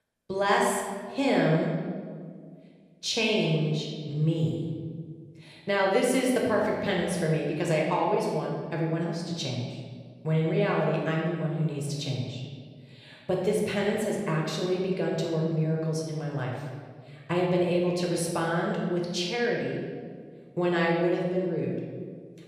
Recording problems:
room echo; noticeable; dies away in 1.5 s
off-mic speech; somewhat distant

